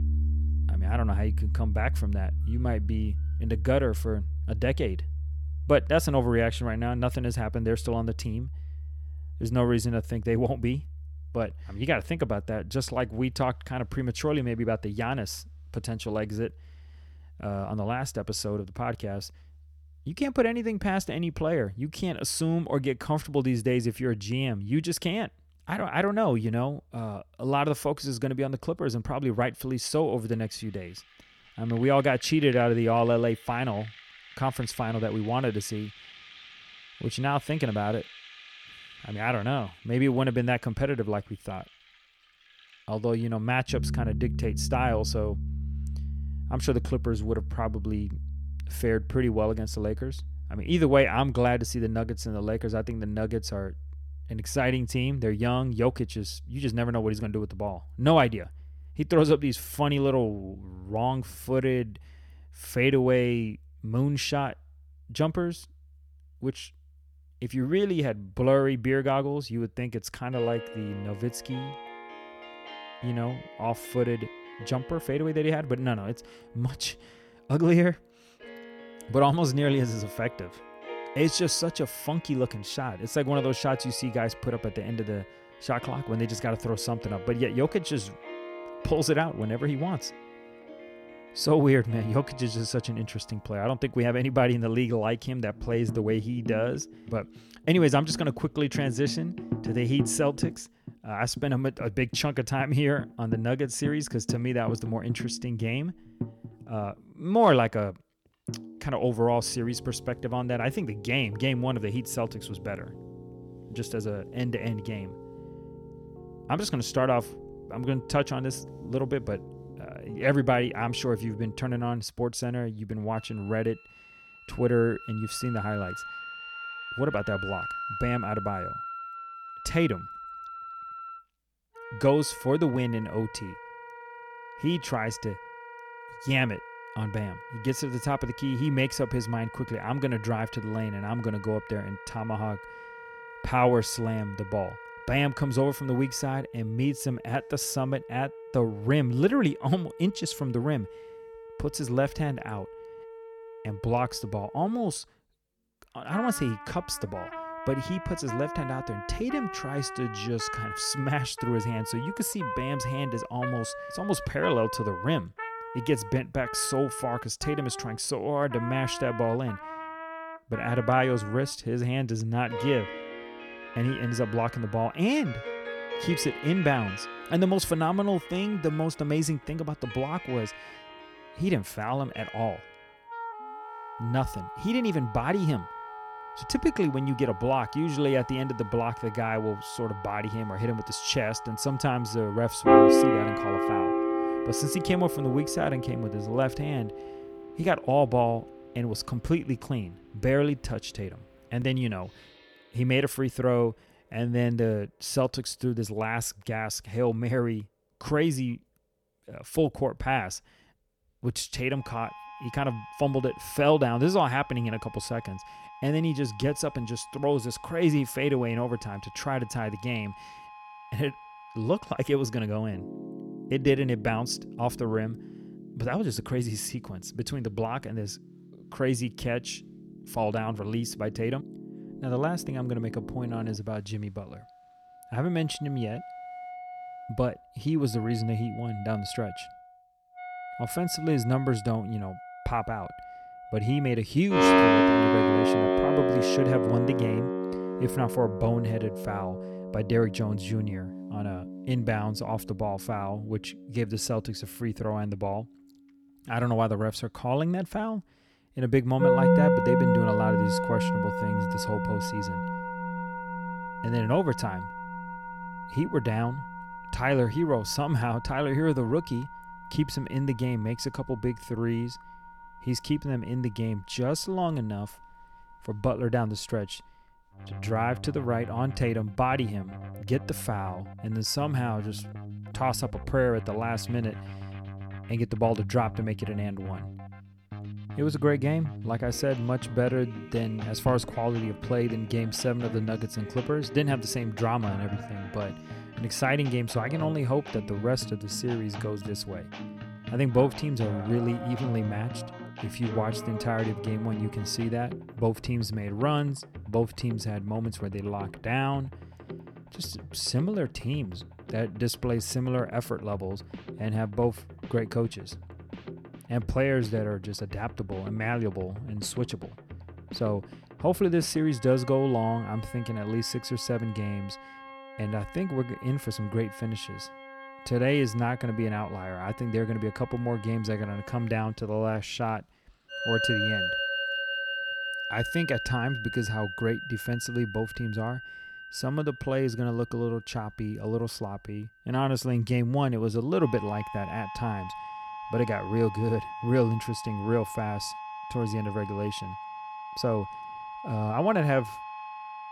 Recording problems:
background music; loud; throughout; 6 dB below the speech

